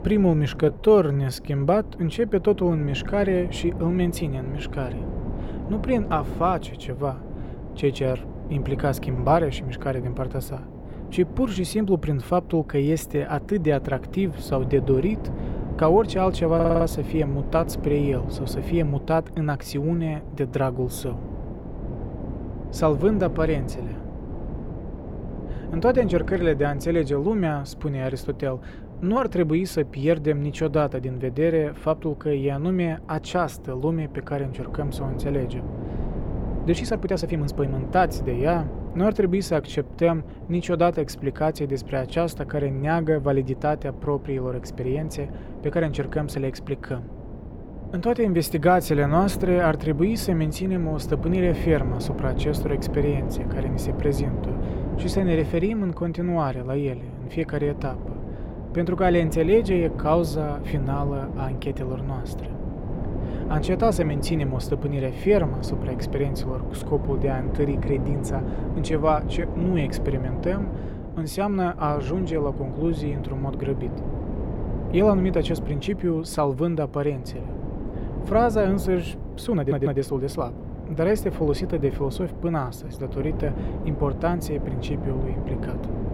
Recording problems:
wind noise on the microphone; occasional gusts; 15 dB below the speech
uneven, jittery; strongly; from 0.5 s to 1:21
audio stuttering; at 17 s and at 1:20

